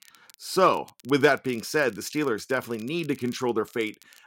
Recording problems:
crackle, like an old record; faint; 25 dB below the speech

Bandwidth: 16 kHz